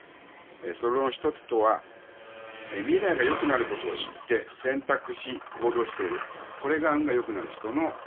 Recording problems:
phone-call audio; poor line; nothing above 3.5 kHz
traffic noise; noticeable; throughout; 10 dB below the speech

